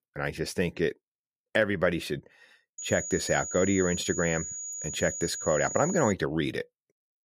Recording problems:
high-pitched whine; loud; from 3 to 6 s; 7 kHz, 6 dB below the speech

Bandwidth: 15 kHz